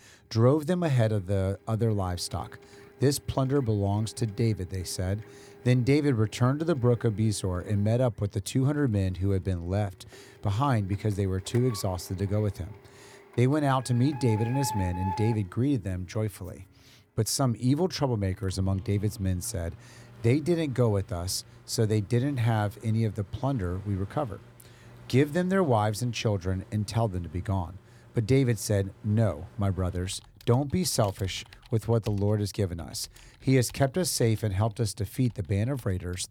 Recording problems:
household noises; noticeable; throughout; 20 dB below the speech

